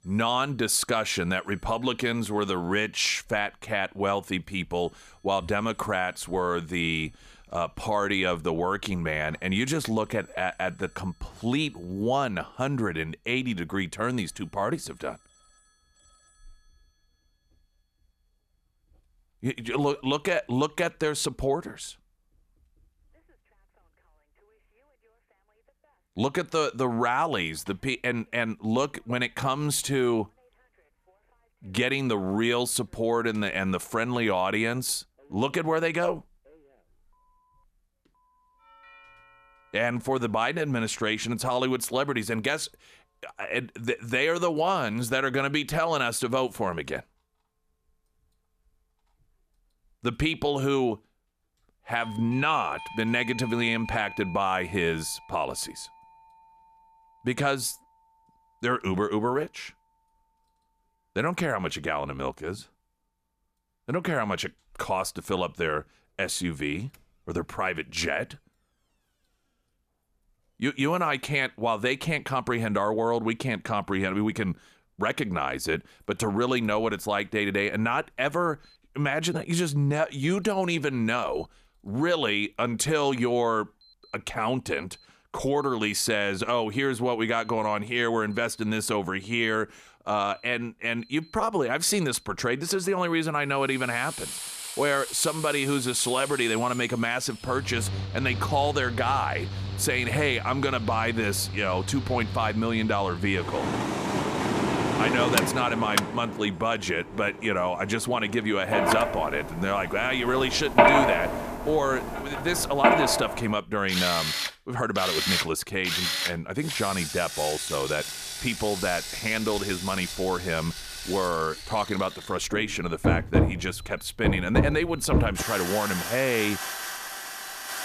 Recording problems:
machinery noise; loud; from 1:34 on; 2 dB below the speech
alarms or sirens; faint; throughout; 25 dB below the speech

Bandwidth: 14.5 kHz